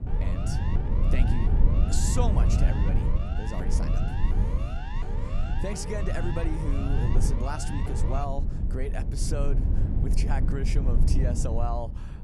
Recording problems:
low rumble; loud; throughout; 5 dB below the speech
siren; noticeable; until 8.5 s; peak 6 dB below the speech

